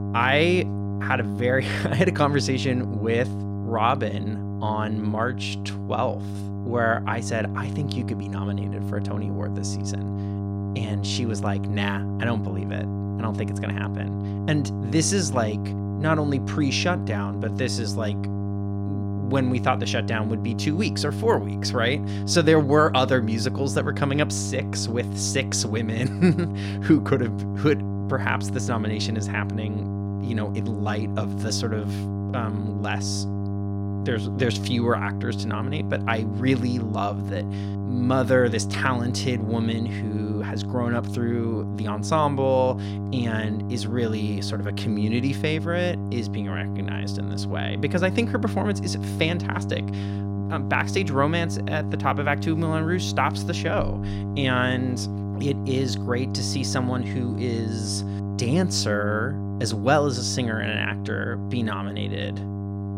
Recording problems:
electrical hum; noticeable; throughout; 50 Hz, 10 dB below the speech

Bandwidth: 16 kHz